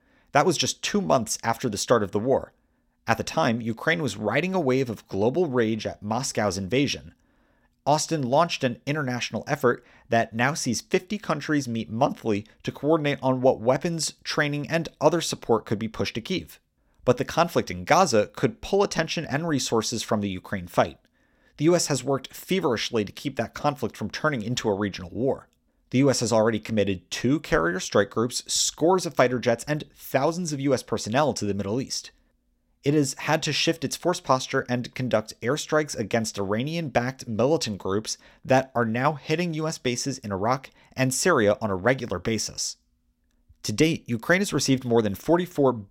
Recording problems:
none

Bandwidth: 16.5 kHz